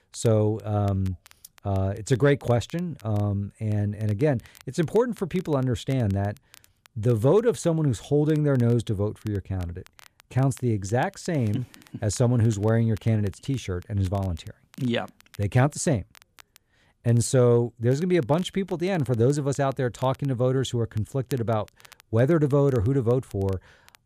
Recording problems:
crackle, like an old record; faint; 30 dB below the speech

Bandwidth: 14.5 kHz